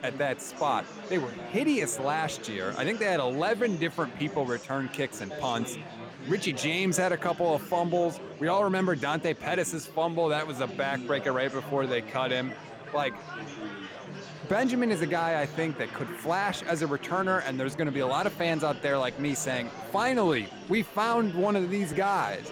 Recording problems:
murmuring crowd; noticeable; throughout; 10 dB below the speech

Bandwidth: 17.5 kHz